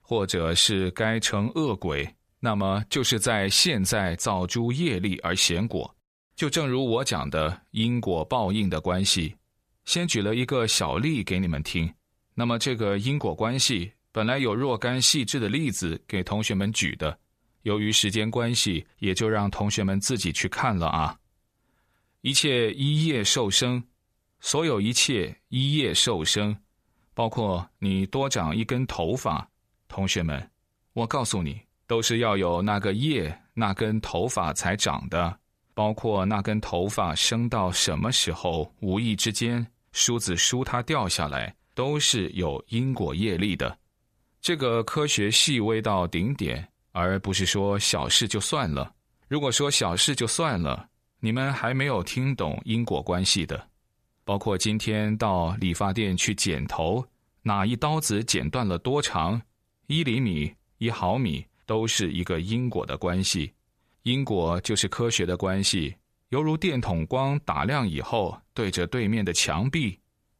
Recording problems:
none

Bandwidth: 14.5 kHz